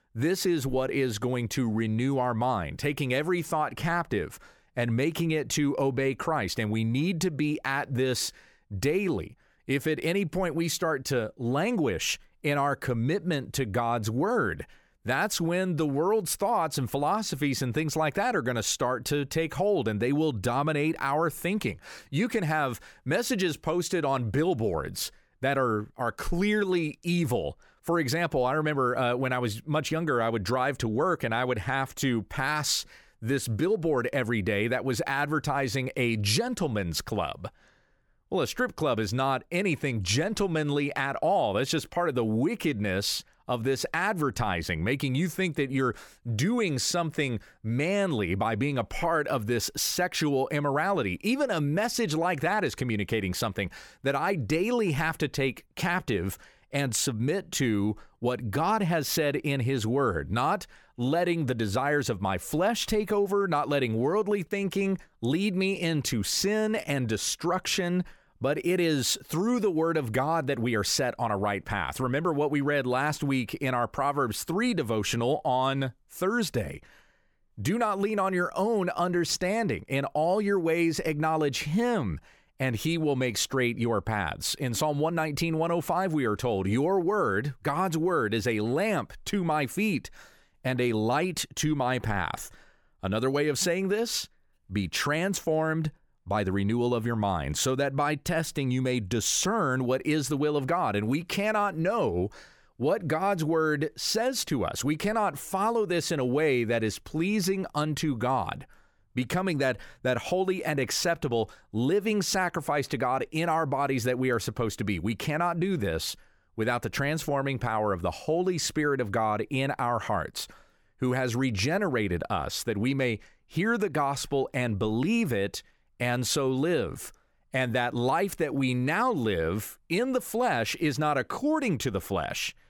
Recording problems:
none

